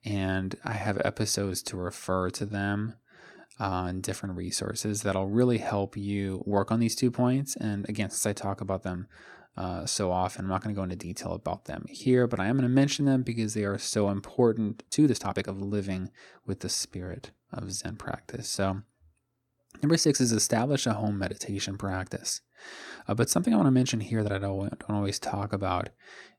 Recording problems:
uneven, jittery; strongly; from 0.5 to 26 s

